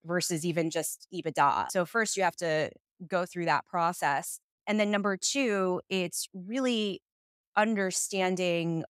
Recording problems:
none

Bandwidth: 15.5 kHz